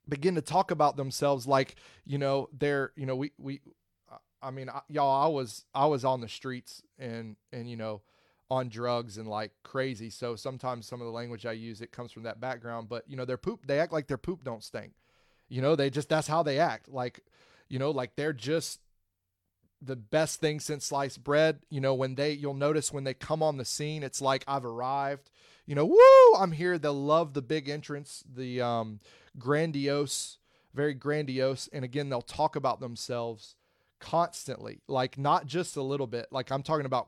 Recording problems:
none

